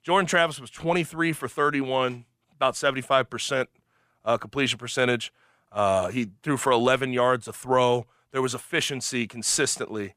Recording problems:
none

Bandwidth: 15 kHz